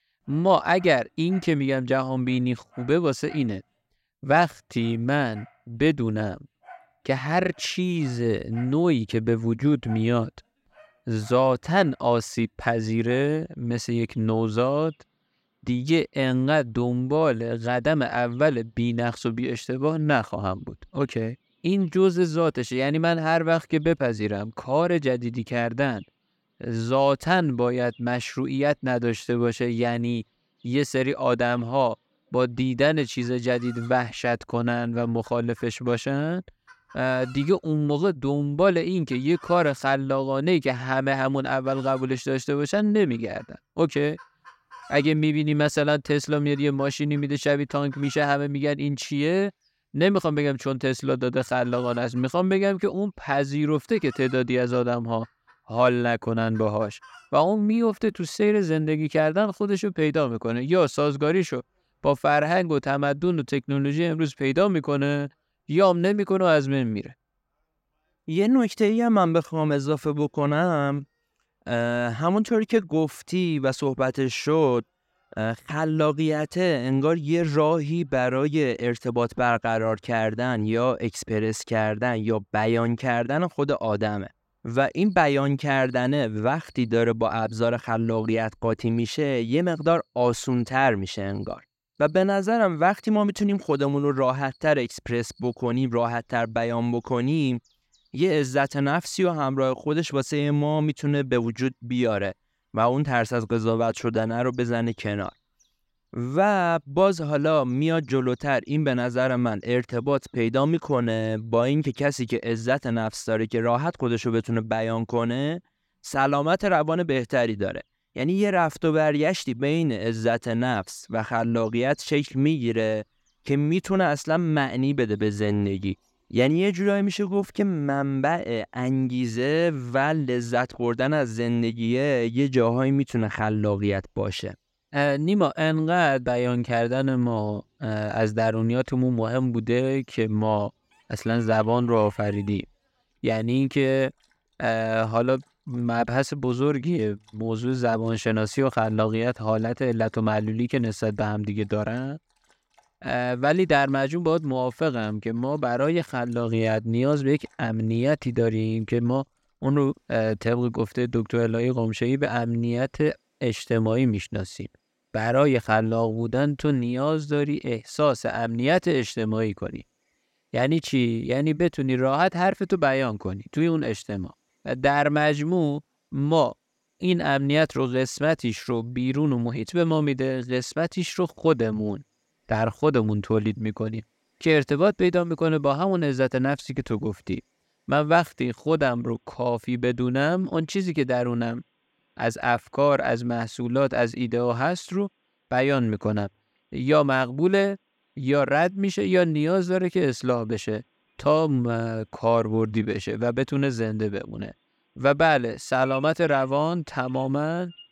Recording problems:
animal sounds; faint; throughout; 30 dB below the speech

